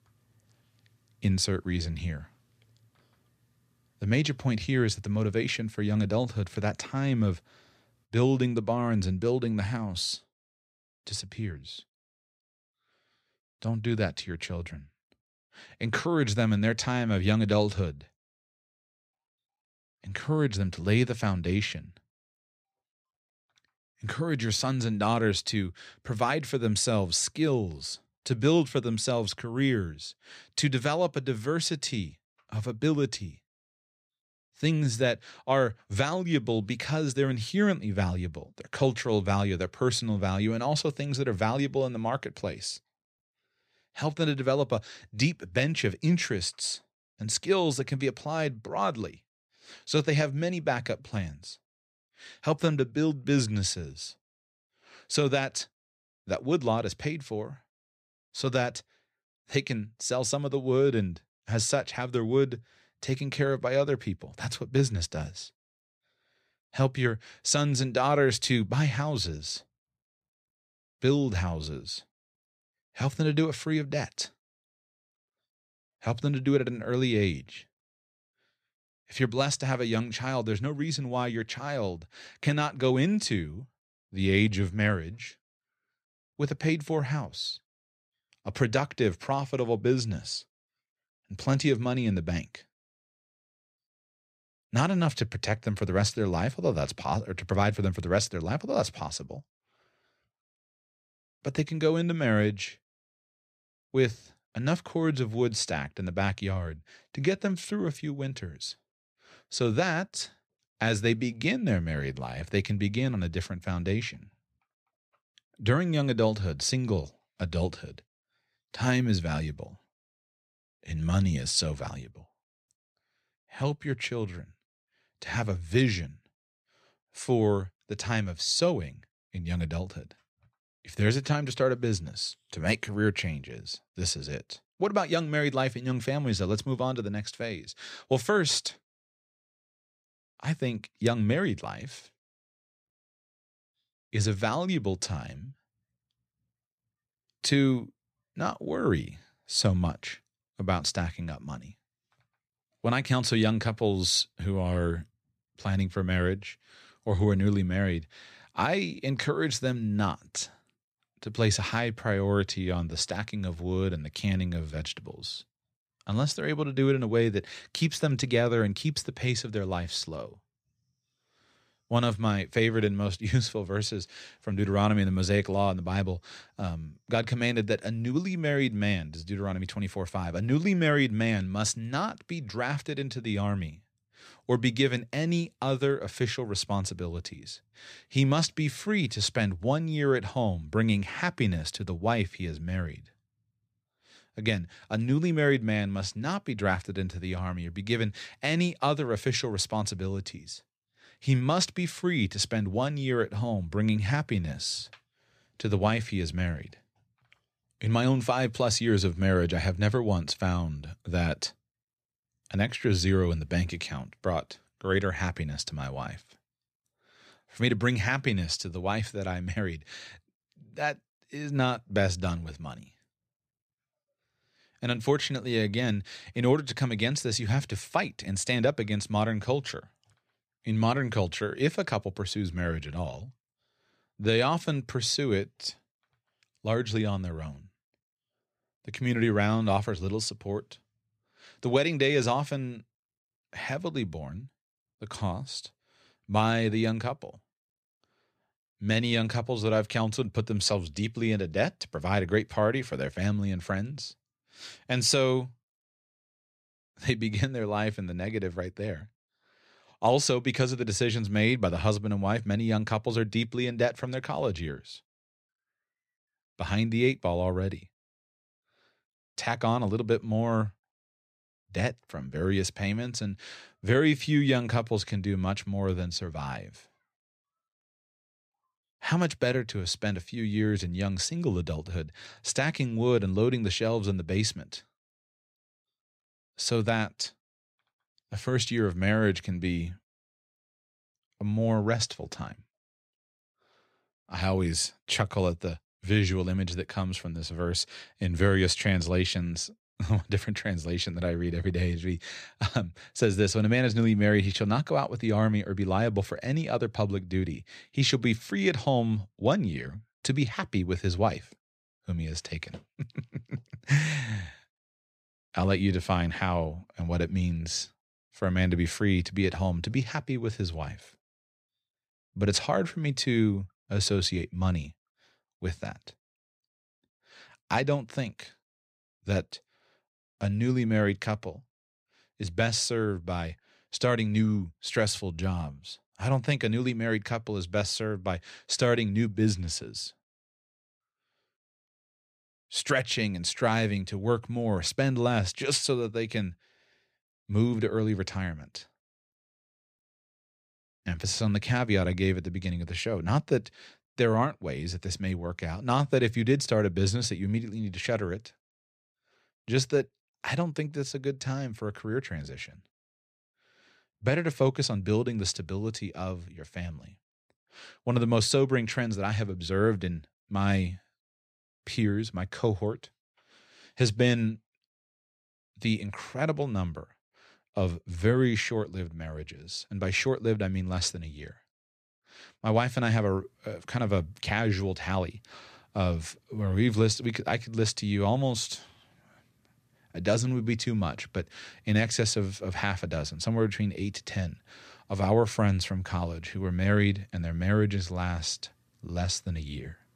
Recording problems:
none

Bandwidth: 14.5 kHz